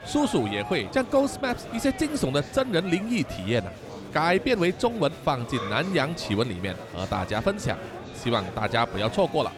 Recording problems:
murmuring crowd; noticeable; throughout; 10 dB below the speech

